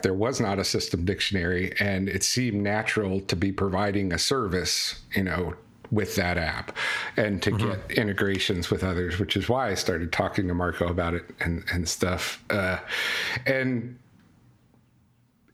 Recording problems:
squashed, flat; heavily

